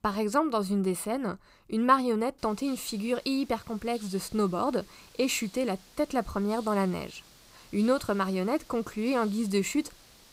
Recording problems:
hiss; faint; from 2.5 s on; 20 dB below the speech

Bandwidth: 15.5 kHz